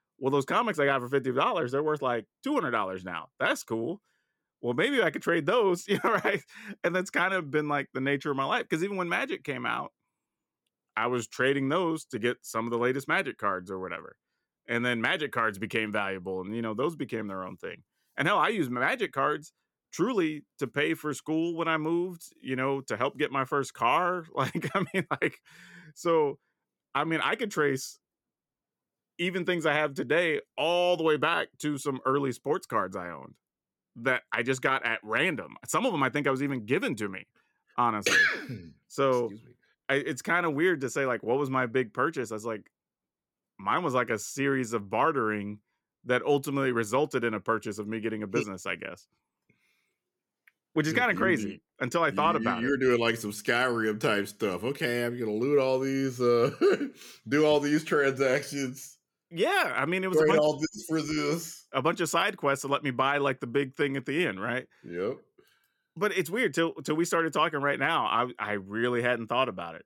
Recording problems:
none

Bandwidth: 17.5 kHz